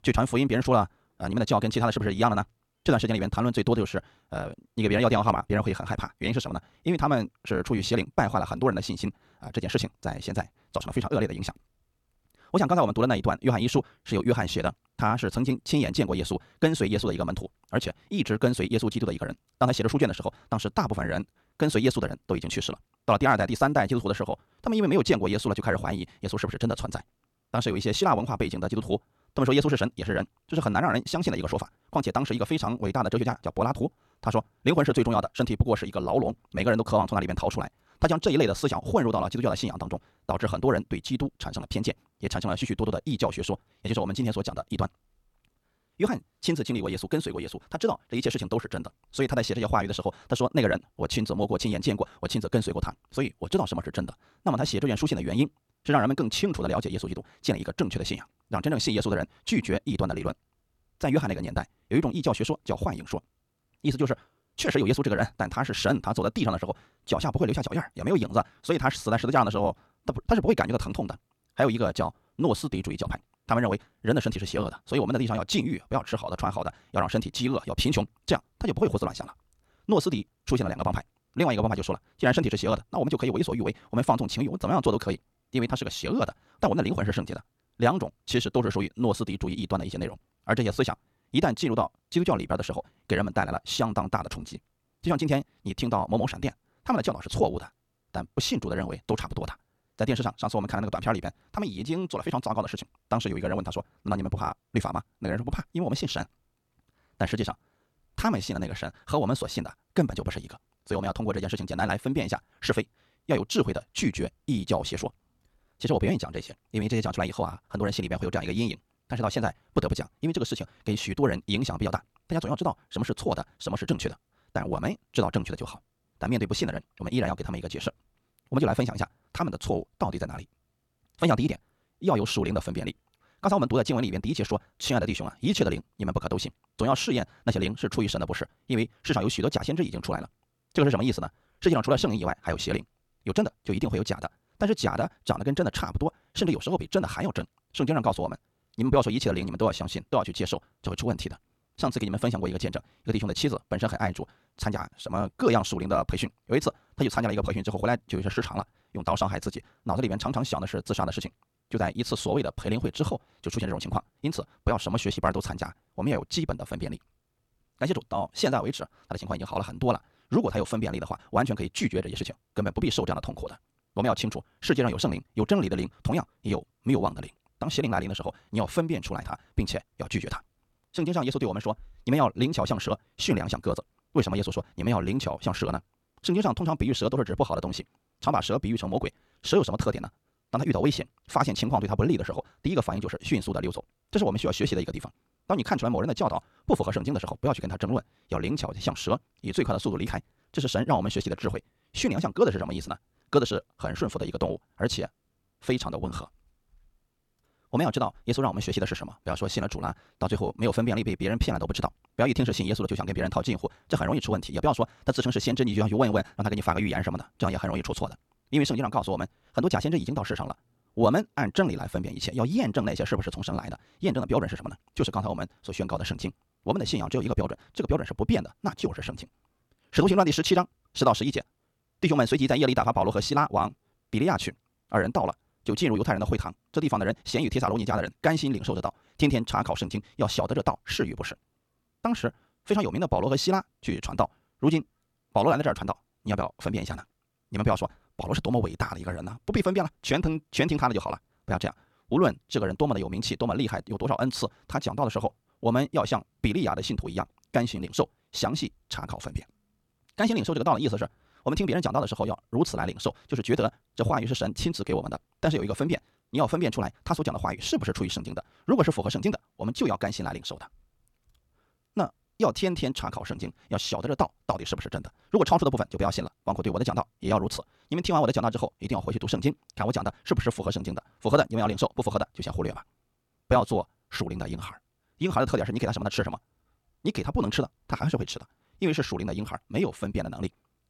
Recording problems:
wrong speed, natural pitch; too fast; 1.7 times normal speed

